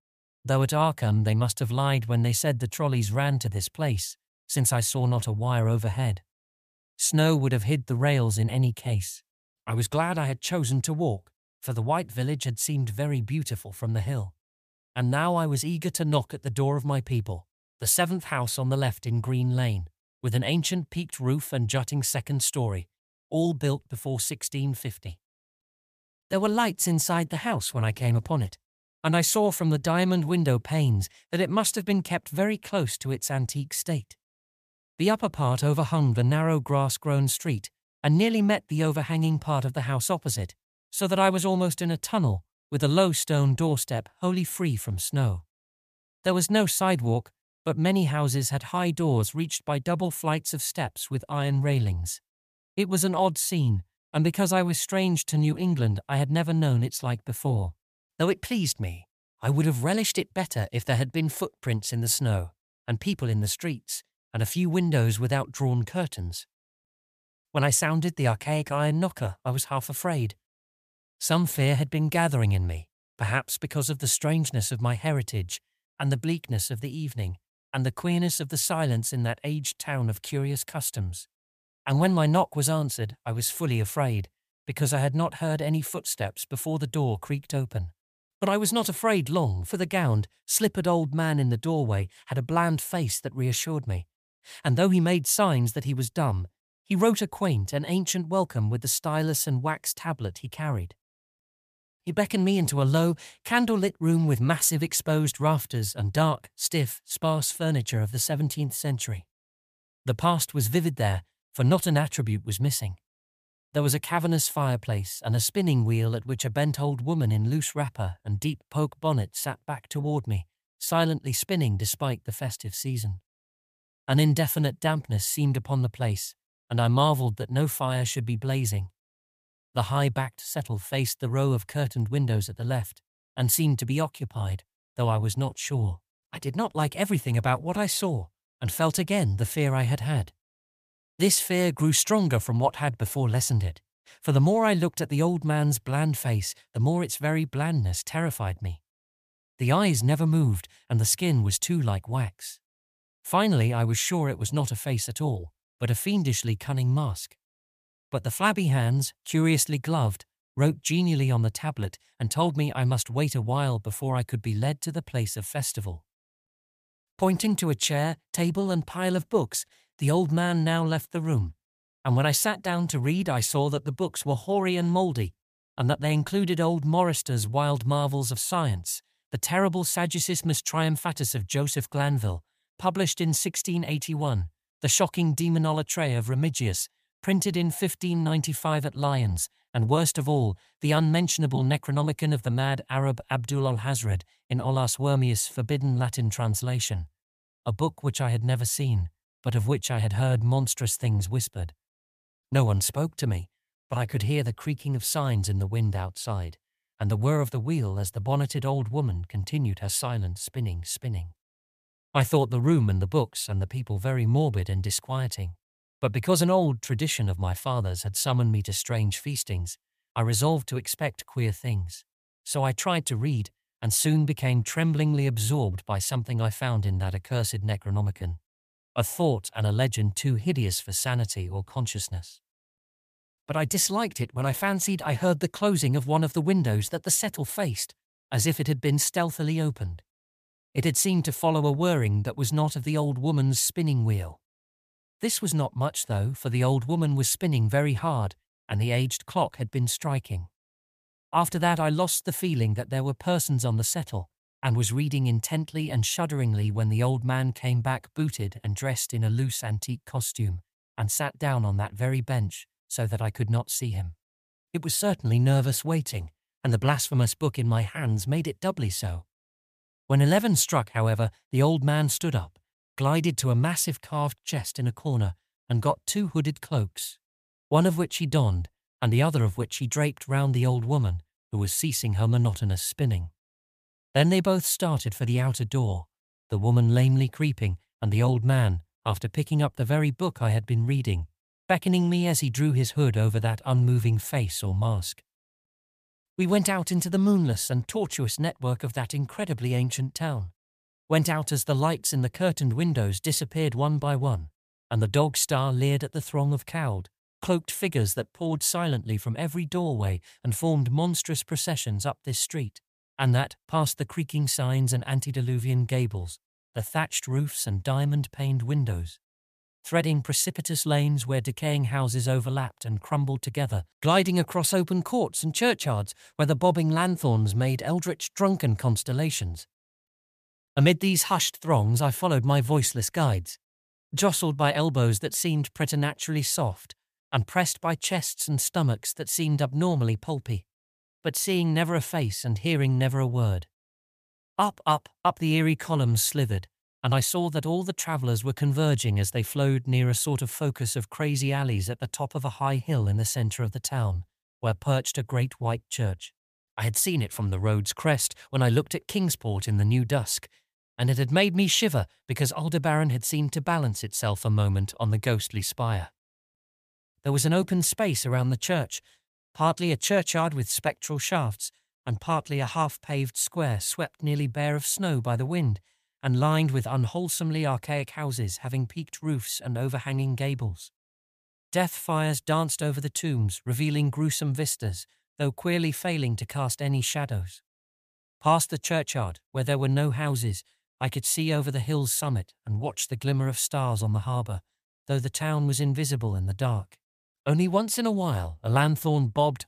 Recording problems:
none

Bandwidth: 14.5 kHz